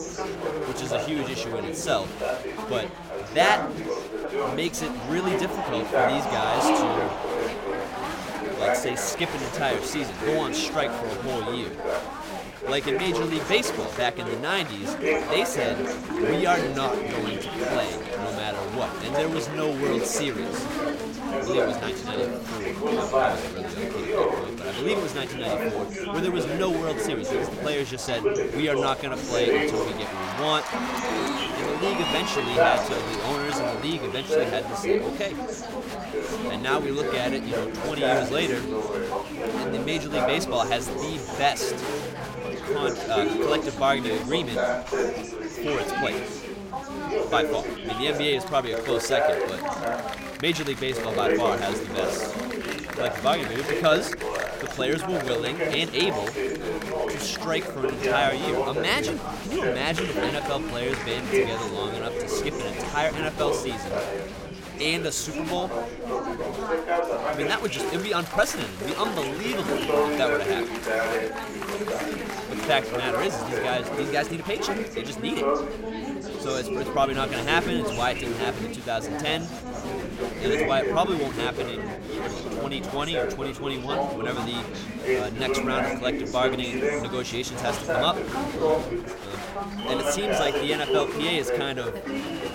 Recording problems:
chatter from many people; very loud; throughout; as loud as the speech

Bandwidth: 16.5 kHz